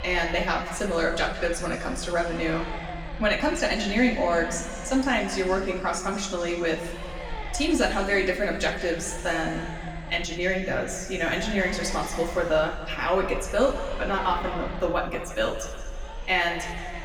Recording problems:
room echo; noticeable; dies away in 1.9 s
echo of what is said; faint; throughout; 310 ms later, 25 dB below the speech
off-mic speech; somewhat distant
low rumble; noticeable; throughout; 15 dB below the speech

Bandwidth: 18.5 kHz